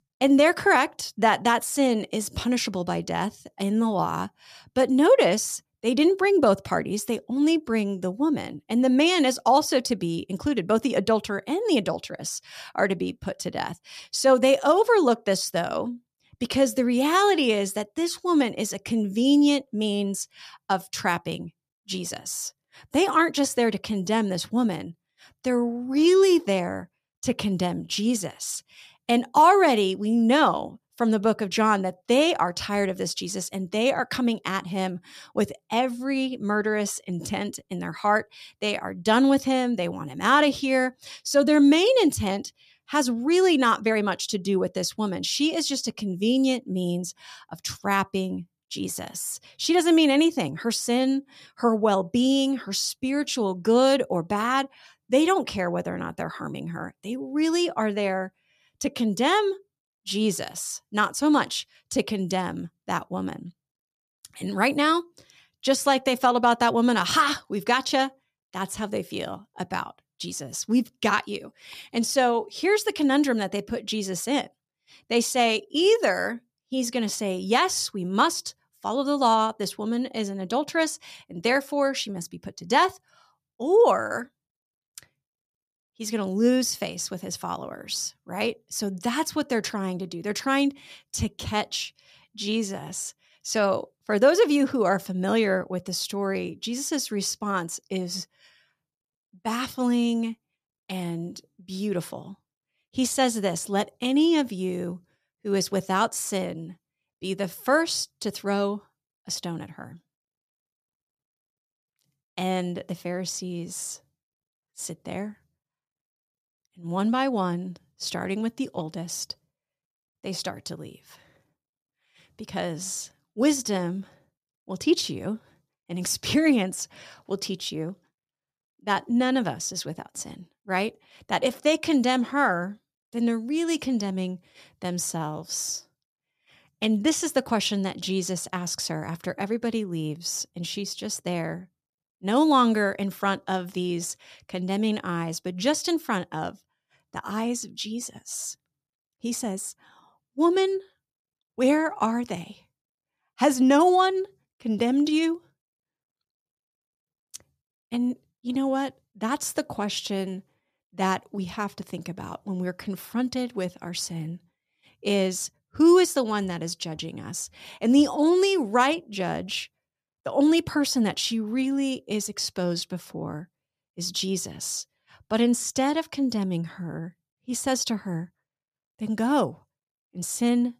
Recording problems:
none

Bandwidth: 14.5 kHz